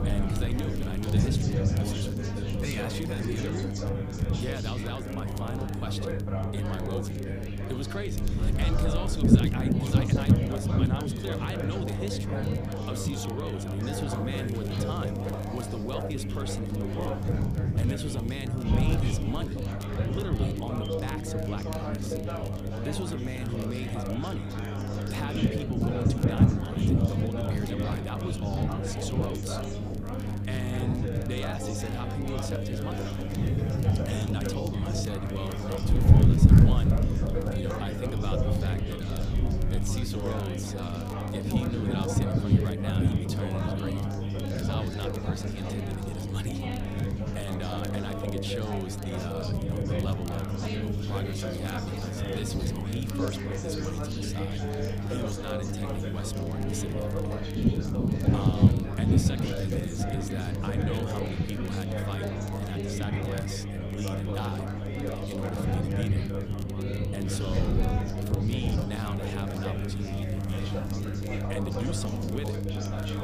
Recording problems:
chatter from many people; very loud; throughout; as loud as the speech
wind noise on the microphone; heavy; 1 dB above the speech
electrical hum; loud; throughout; 50 Hz, 5 dB below the speech
crackle, like an old record; noticeable; 15 dB below the speech
hiss; faint; throughout; 25 dB below the speech

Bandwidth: 15 kHz